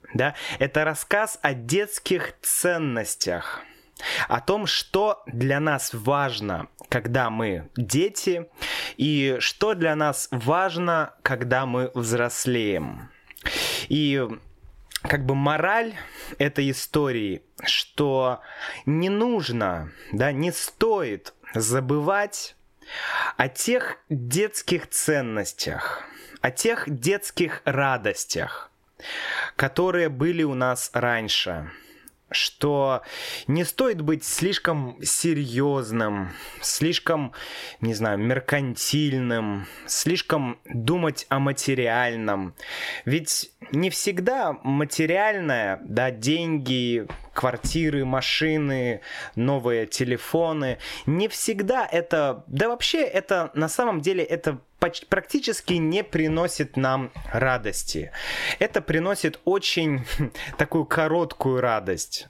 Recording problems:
squashed, flat; heavily

